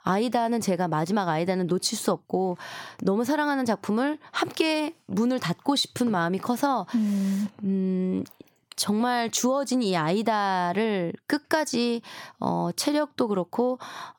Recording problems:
squashed, flat; somewhat

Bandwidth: 17.5 kHz